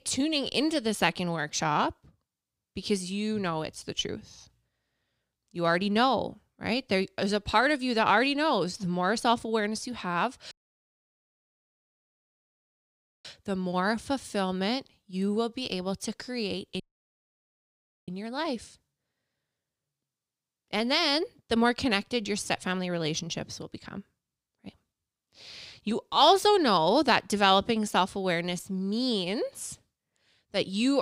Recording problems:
audio cutting out; at 11 s for 2.5 s and at 17 s for 1.5 s
abrupt cut into speech; at the end

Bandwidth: 15.5 kHz